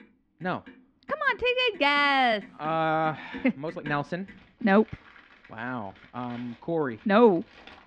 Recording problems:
muffled; slightly; fading above 3.5 kHz
household noises; faint; throughout; 25 dB below the speech
uneven, jittery; strongly; from 1 to 7.5 s

